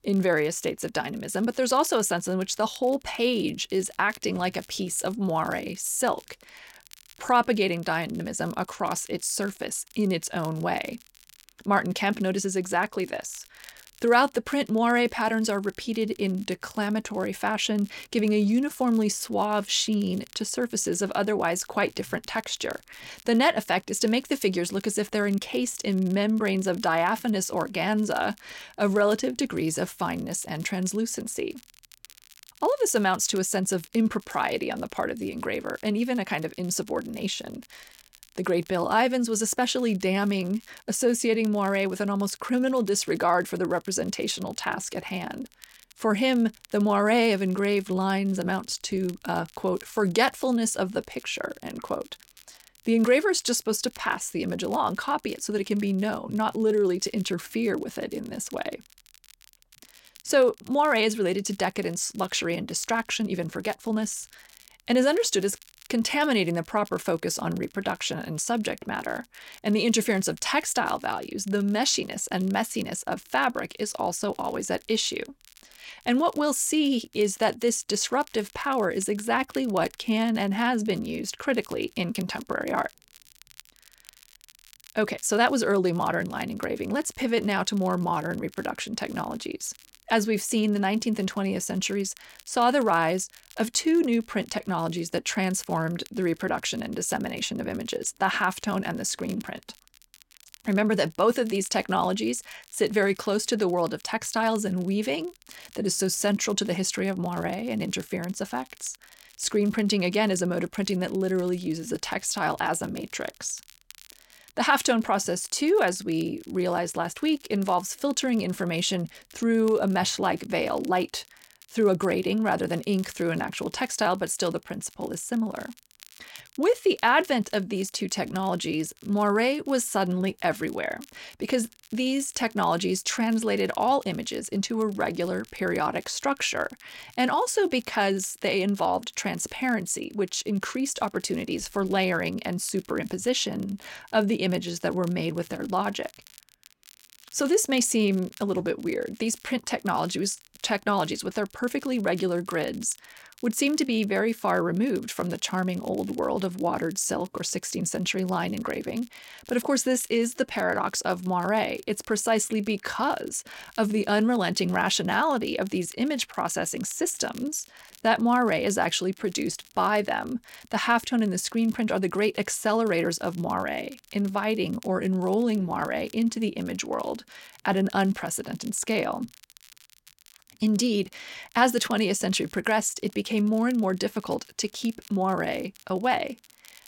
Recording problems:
crackle, like an old record; faint; 25 dB below the speech

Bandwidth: 16.5 kHz